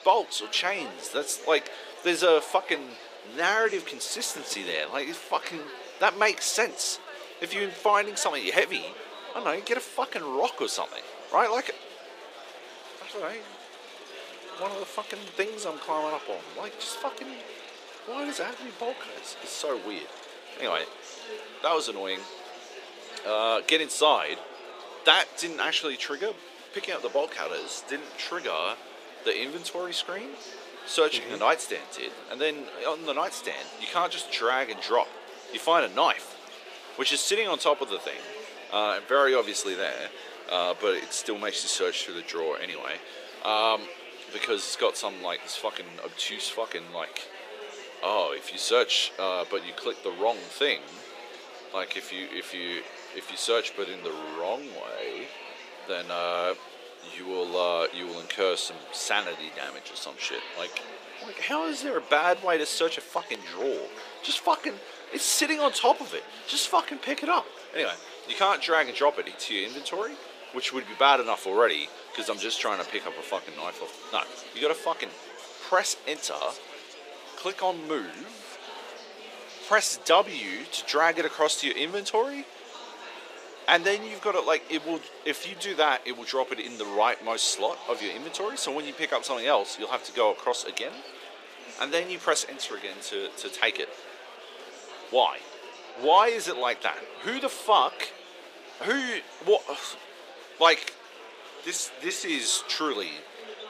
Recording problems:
thin; very; fading below 400 Hz
murmuring crowd; noticeable; throughout; 15 dB below the speech

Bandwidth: 15 kHz